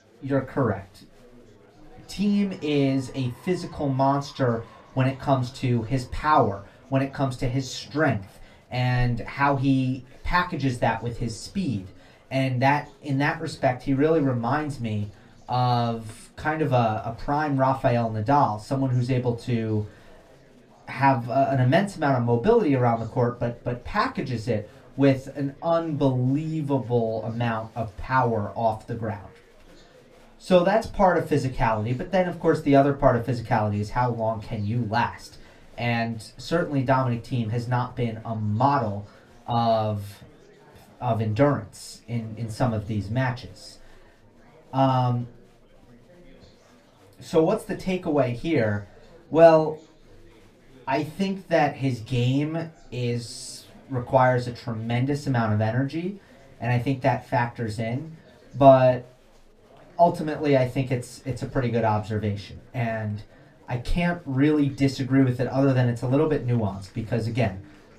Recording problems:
room echo; very slight; dies away in 0.2 s
off-mic speech; somewhat distant
chatter from many people; faint; throughout; 30 dB below the speech

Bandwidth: 15 kHz